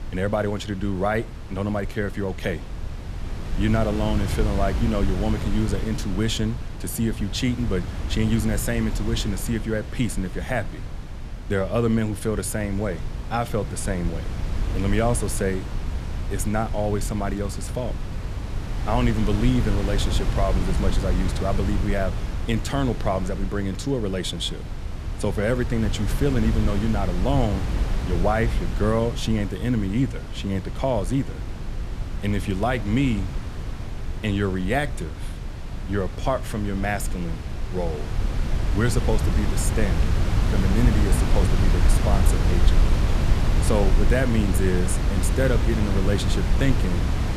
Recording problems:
wind noise on the microphone; heavy; 8 dB below the speech

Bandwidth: 14 kHz